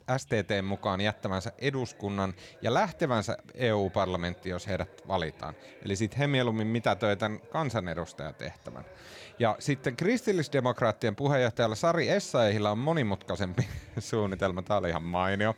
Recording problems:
background chatter; faint; throughout; 3 voices, 25 dB below the speech

